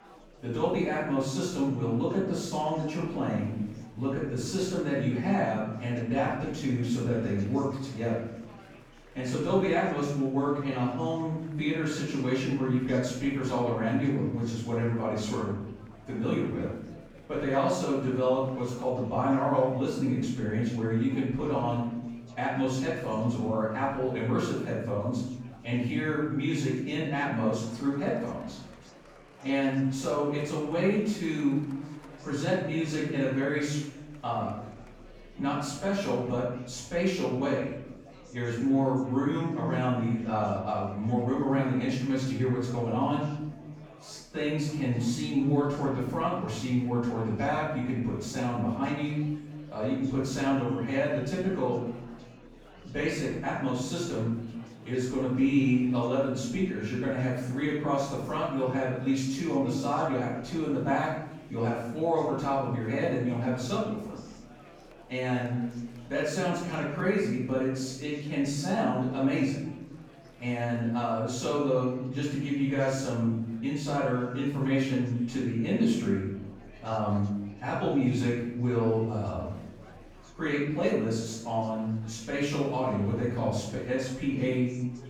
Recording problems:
off-mic speech; far
room echo; noticeable; dies away in 0.9 s
murmuring crowd; faint; throughout; 25 dB below the speech

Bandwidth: 18.5 kHz